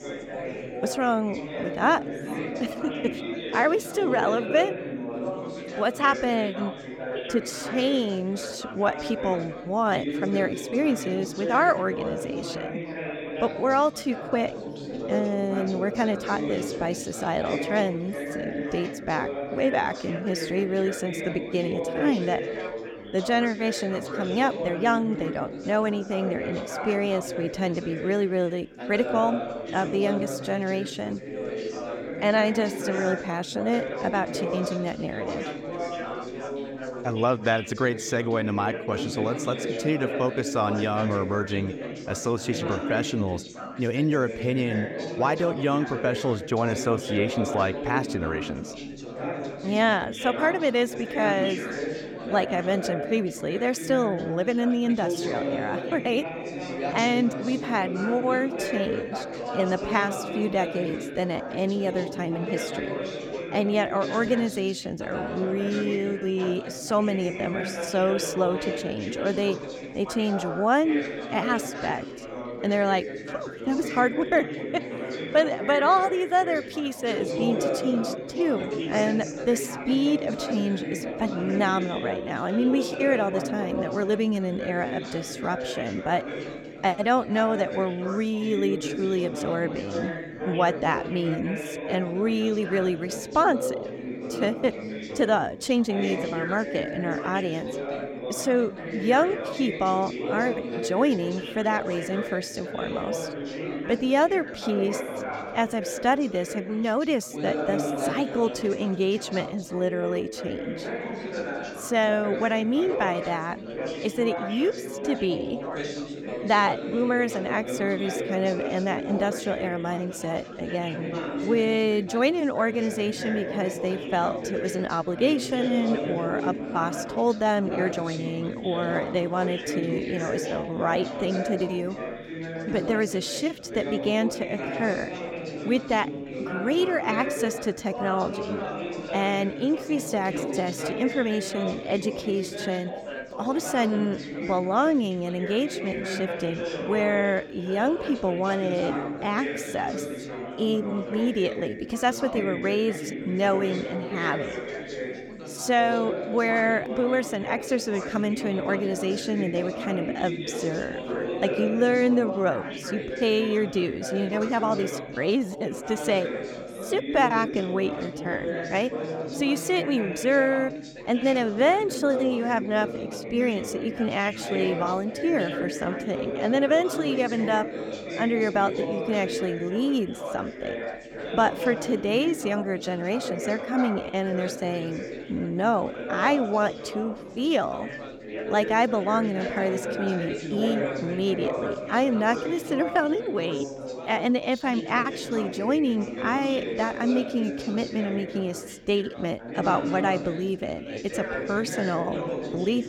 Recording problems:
background chatter; loud; throughout; 4 voices, 6 dB below the speech

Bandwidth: 17 kHz